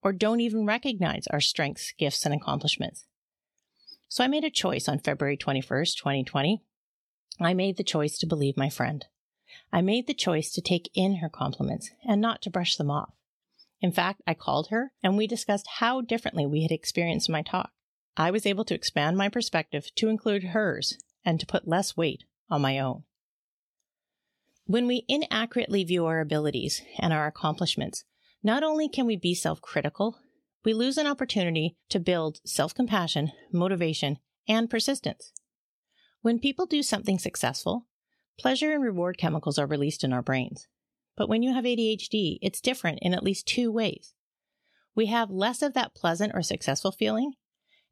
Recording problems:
none

